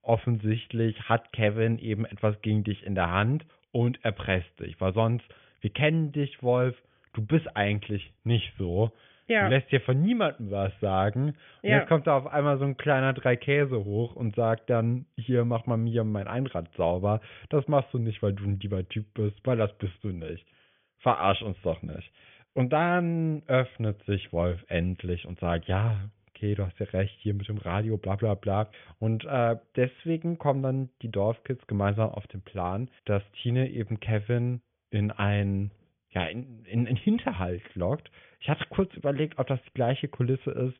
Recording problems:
high frequencies cut off; severe; nothing above 3.5 kHz

